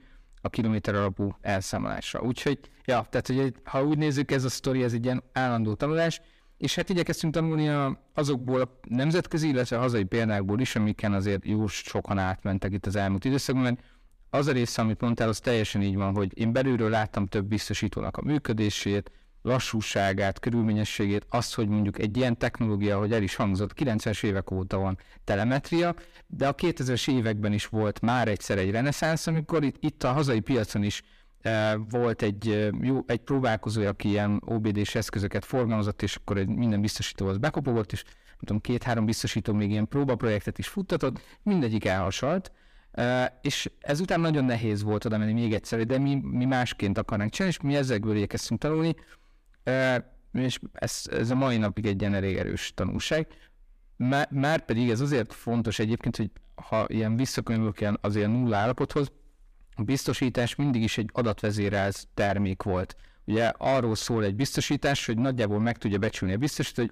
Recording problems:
distortion; slight; 10 dB below the speech

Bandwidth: 15 kHz